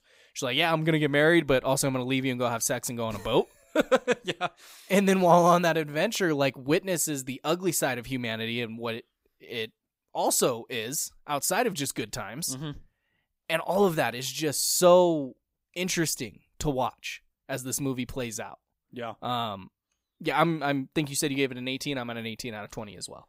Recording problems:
none

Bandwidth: 15.5 kHz